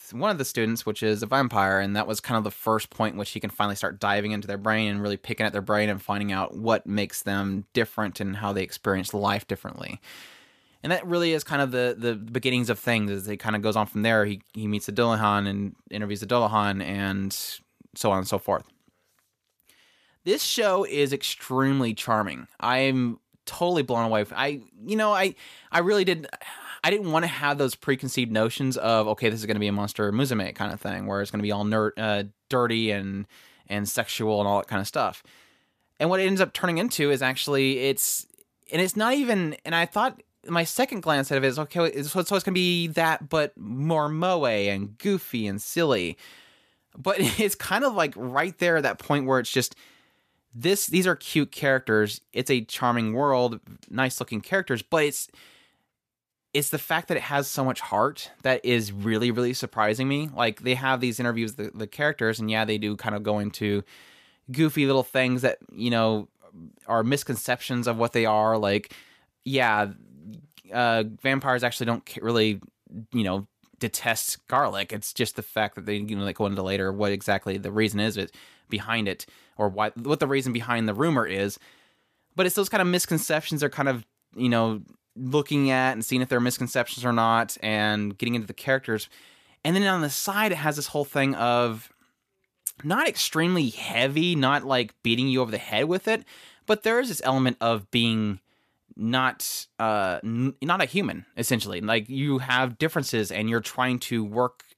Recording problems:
none

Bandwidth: 14.5 kHz